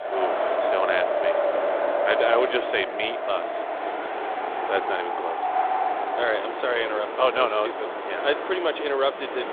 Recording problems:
phone-call audio; nothing above 3.5 kHz
wind in the background; loud; throughout; as loud as the speech

